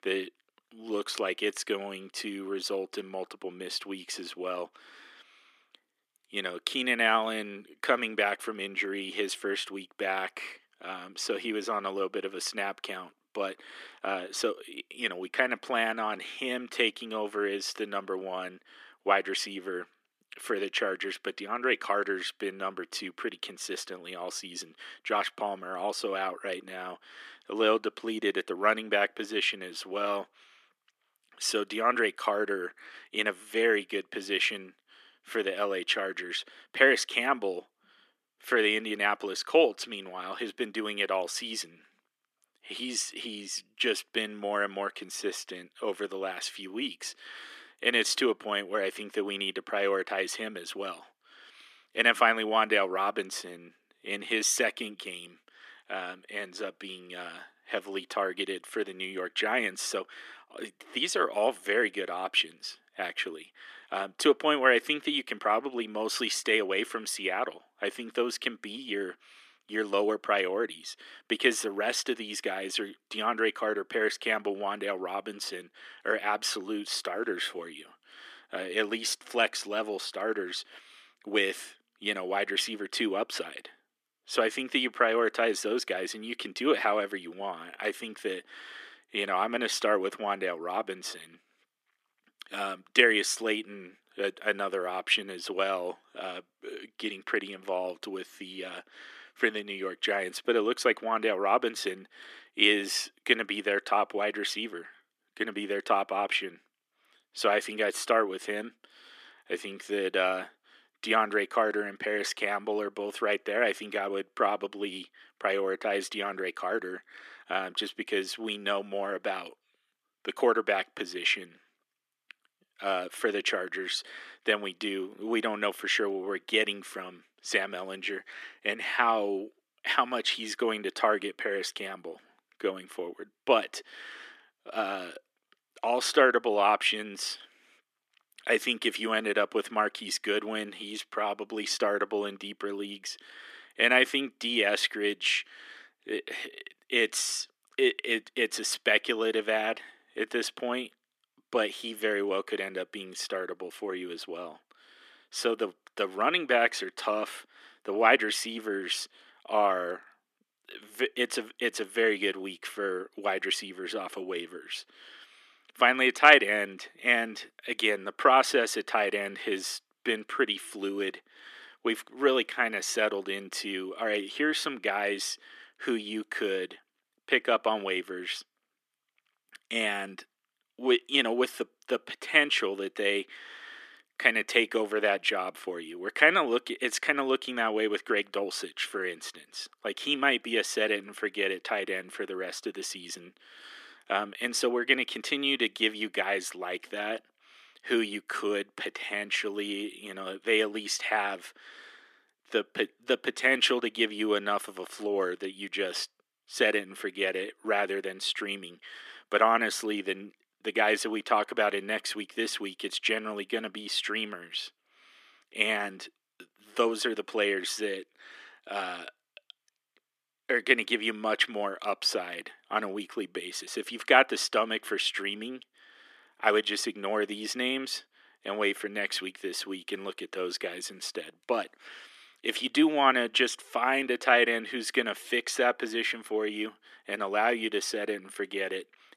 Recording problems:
thin; very; fading below 300 Hz

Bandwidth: 14.5 kHz